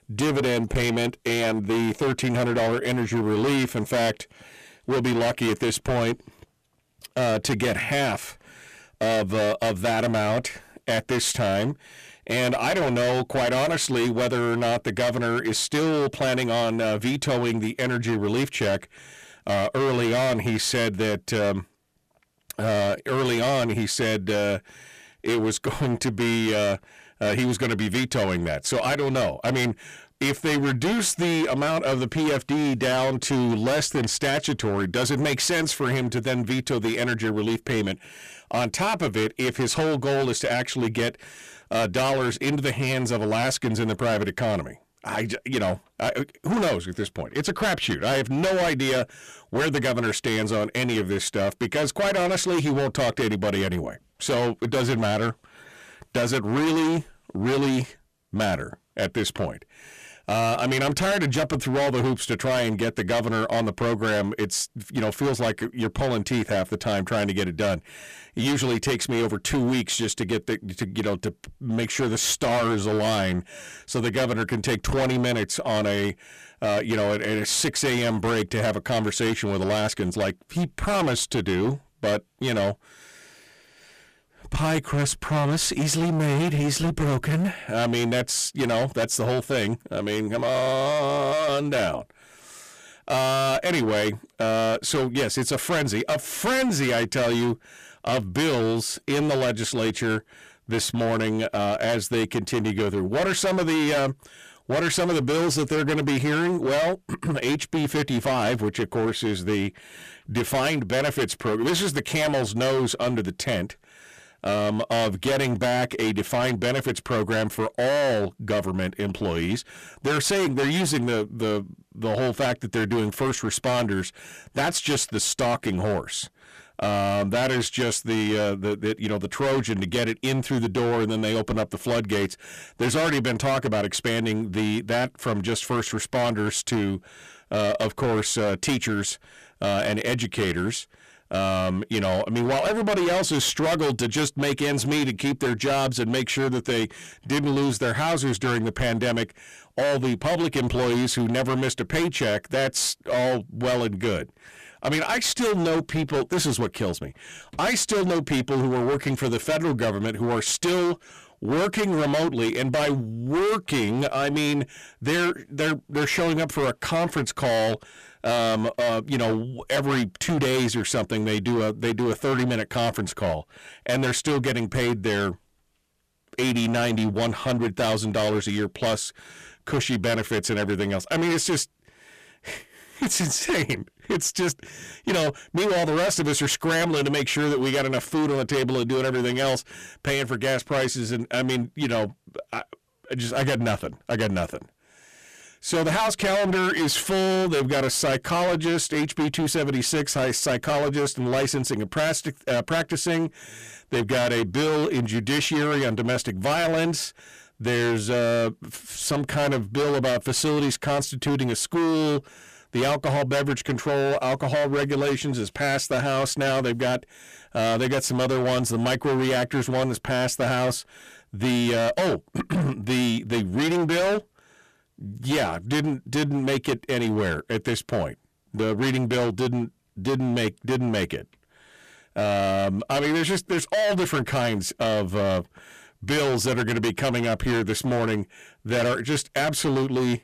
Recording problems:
distortion; heavy; 24% of the sound clipped

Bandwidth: 14.5 kHz